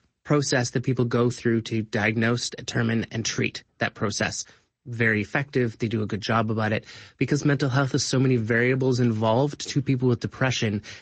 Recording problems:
high frequencies cut off; noticeable; nothing above 7.5 kHz
garbled, watery; slightly

